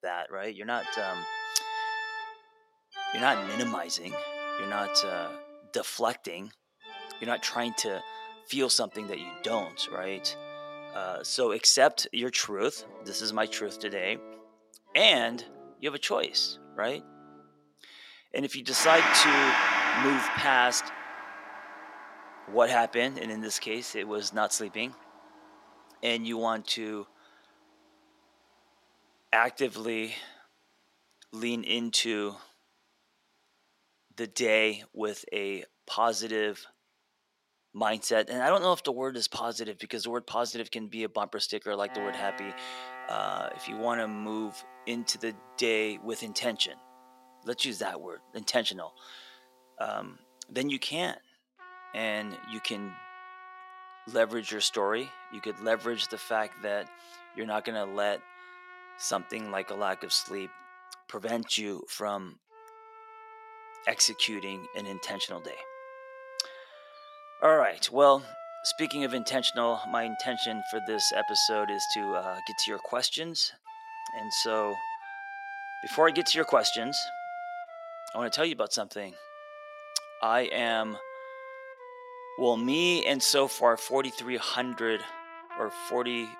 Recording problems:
thin; somewhat; fading below 400 Hz
background music; loud; throughout; 6 dB below the speech

